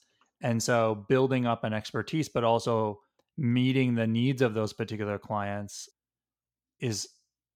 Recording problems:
none

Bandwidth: 17 kHz